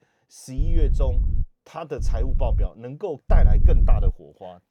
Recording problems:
wind noise on the microphone; heavy; at 0.5 s, at 2 s and at 3.5 s; 9 dB below the speech

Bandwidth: 18.5 kHz